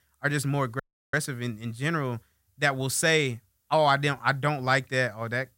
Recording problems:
audio cutting out; at 1 s

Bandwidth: 16 kHz